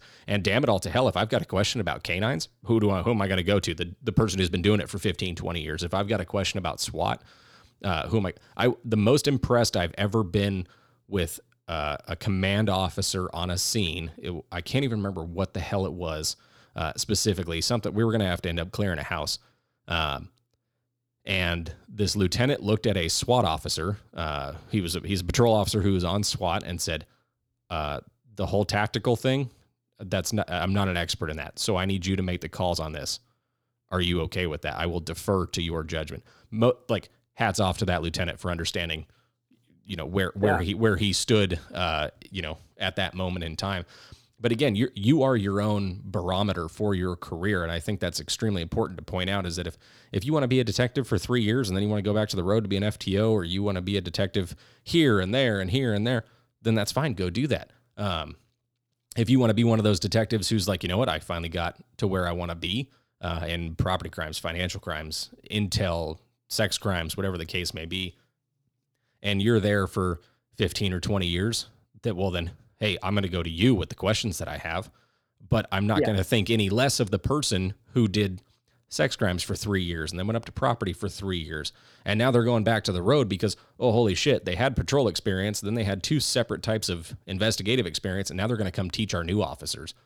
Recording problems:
none

